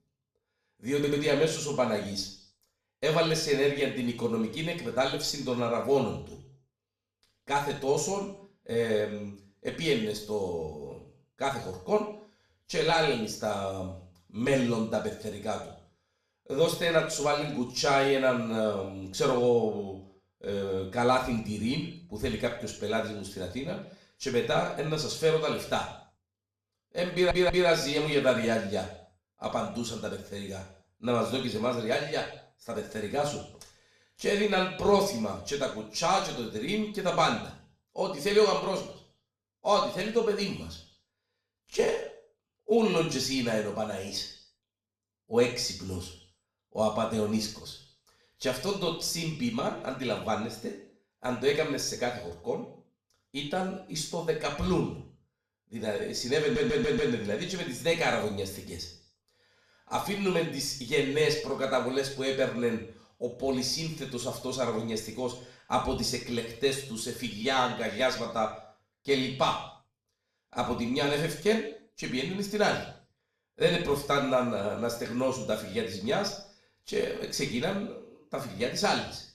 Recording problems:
off-mic speech; far
room echo; slight; dies away in 0.6 s
audio stuttering; at 1 s, at 27 s and at 56 s

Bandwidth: 15 kHz